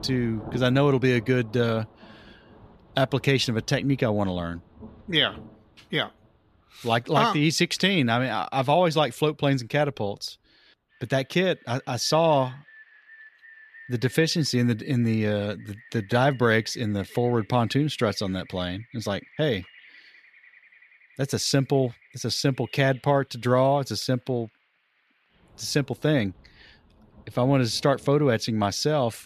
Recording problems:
rain or running water; faint; throughout; 25 dB below the speech

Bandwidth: 14.5 kHz